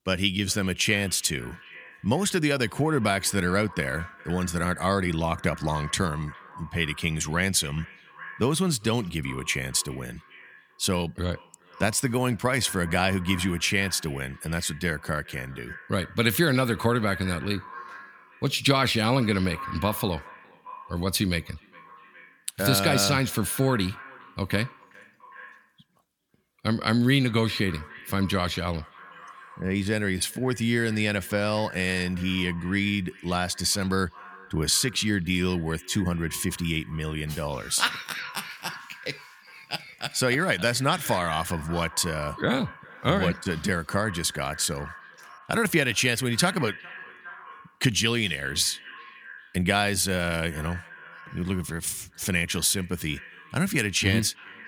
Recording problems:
echo of what is said; faint; throughout; 410 ms later, 20 dB below the speech

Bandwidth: 18.5 kHz